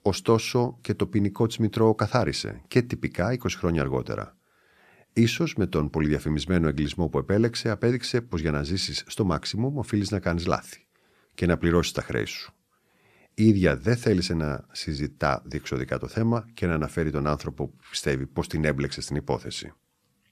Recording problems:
none

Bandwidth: 14 kHz